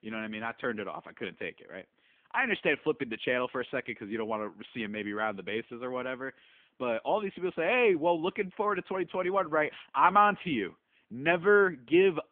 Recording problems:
phone-call audio; nothing above 3.5 kHz

